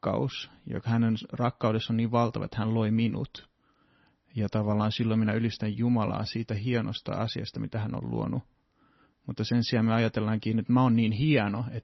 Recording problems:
garbled, watery; slightly; nothing above 5.5 kHz

